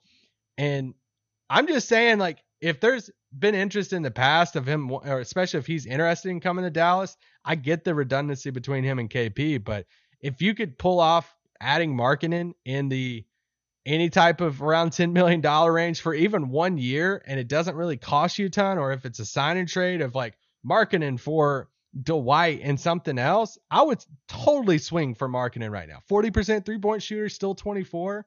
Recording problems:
garbled, watery; slightly; nothing above 6.5 kHz

